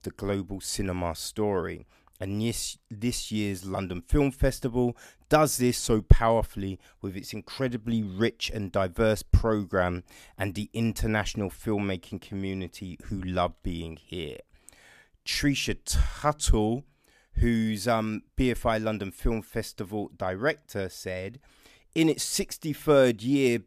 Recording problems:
none

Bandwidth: 14.5 kHz